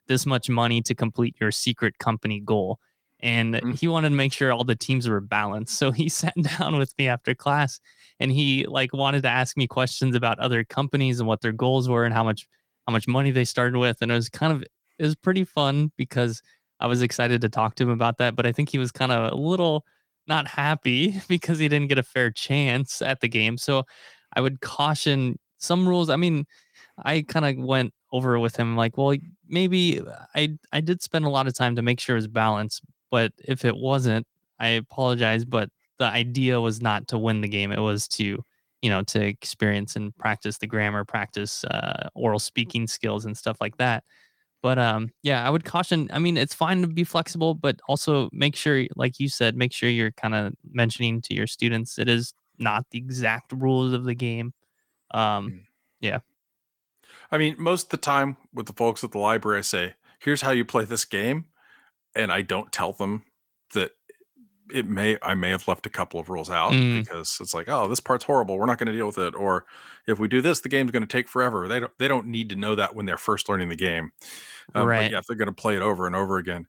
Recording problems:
garbled, watery; slightly; nothing above 18 kHz

